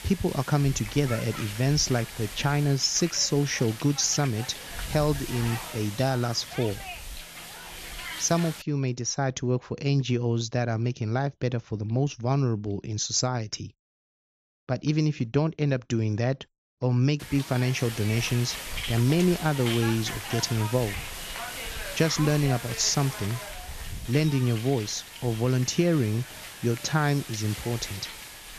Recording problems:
high frequencies cut off; noticeable; nothing above 7.5 kHz
hiss; loud; until 8.5 s and from 17 s on; 10 dB below the speech

